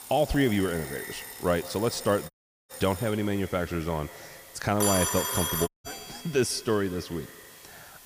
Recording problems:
echo of what is said; noticeable; throughout; 150 ms later, 15 dB below the speech
alarms or sirens; loud; throughout; 5 dB below the speech
hiss; noticeable; throughout; 20 dB below the speech
audio cutting out; at 2.5 s and at 5.5 s

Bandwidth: 15 kHz